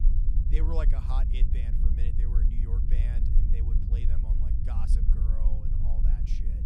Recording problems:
low rumble; loud; throughout; 1 dB below the speech

